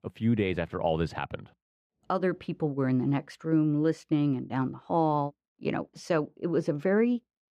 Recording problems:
muffled; slightly; fading above 3.5 kHz

